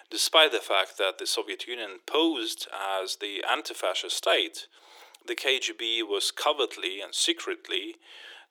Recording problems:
thin; very; fading below 350 Hz

